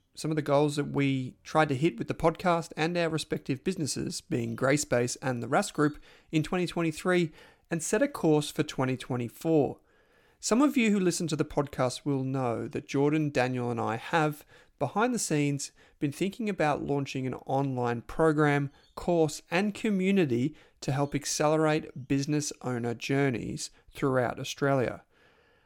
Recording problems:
none

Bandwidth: 17.5 kHz